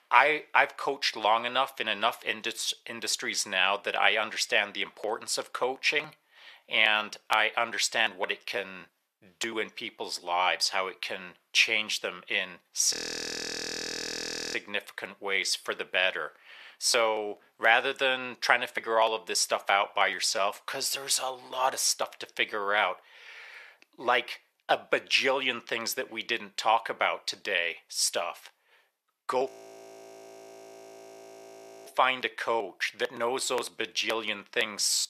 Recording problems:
thin; very; fading below 700 Hz
audio freezing; at 13 s for 1.5 s and at 29 s for 2.5 s

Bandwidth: 14 kHz